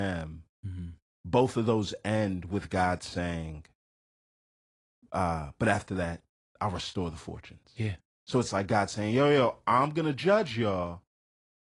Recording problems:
garbled, watery; slightly; nothing above 10 kHz
abrupt cut into speech; at the start

